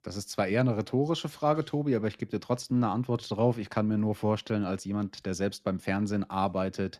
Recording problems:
none

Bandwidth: 13.5 kHz